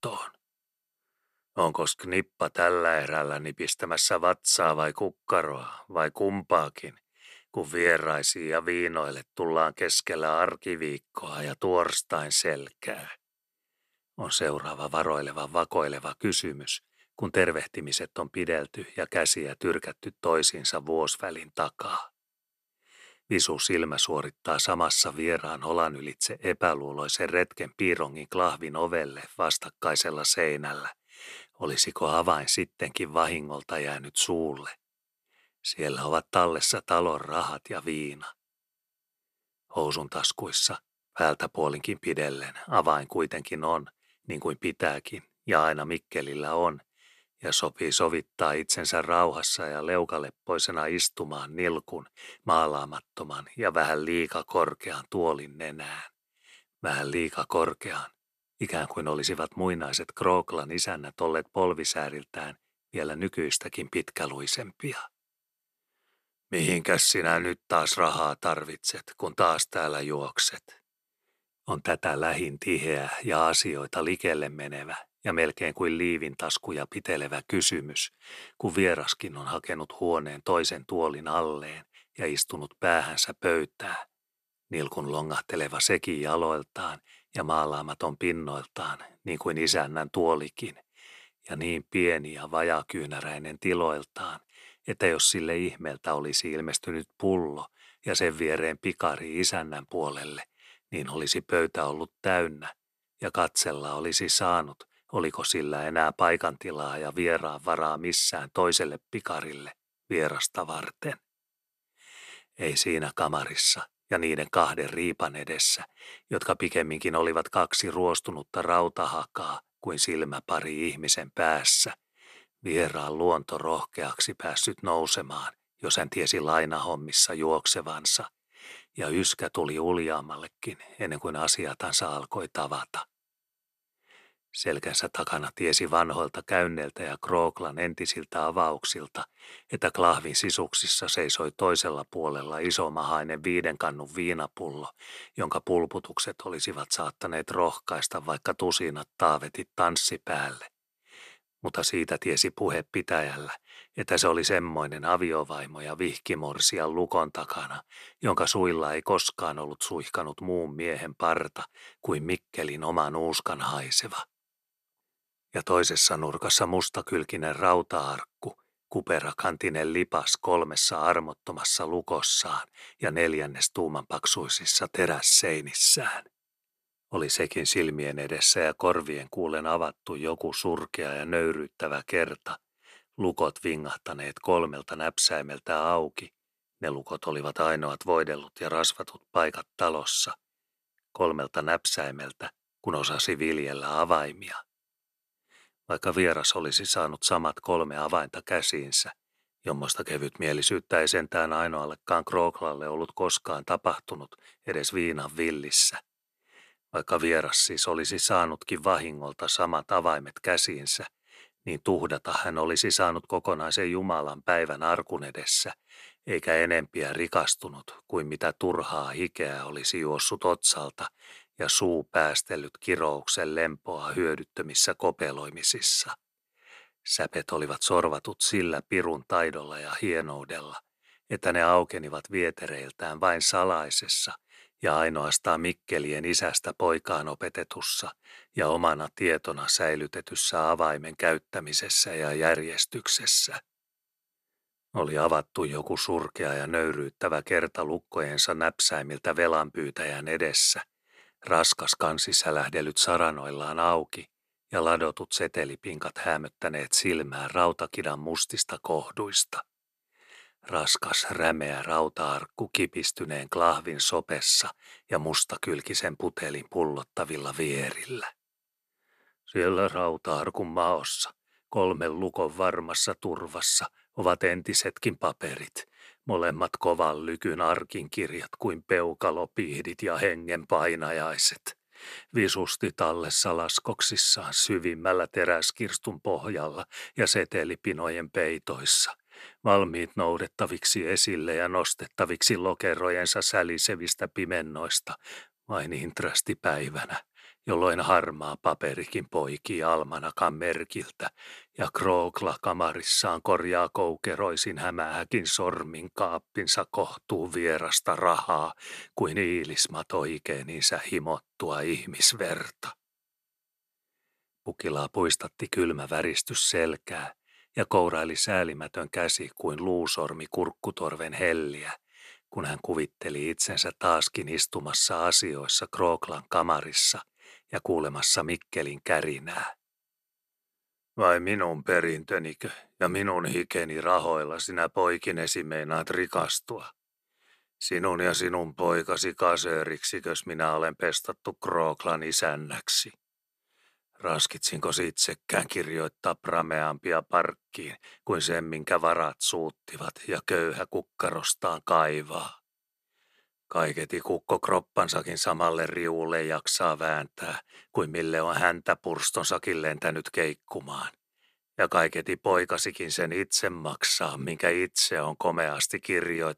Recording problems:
none

